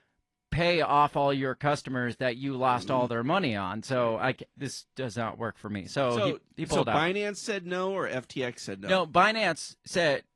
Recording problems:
garbled, watery; slightly

